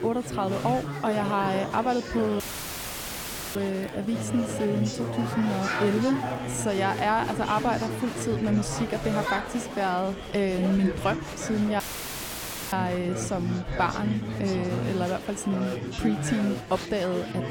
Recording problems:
chatter from many people; loud; throughout; 4 dB below the speech
animal sounds; faint; throughout; 25 dB below the speech
audio cutting out; filled with static; at 2.5 s for 1 s and at 12 s for 1 s

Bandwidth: 17.5 kHz